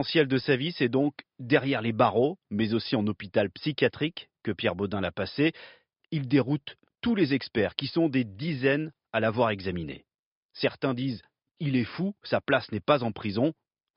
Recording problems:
high frequencies cut off; noticeable; nothing above 5.5 kHz
abrupt cut into speech; at the start

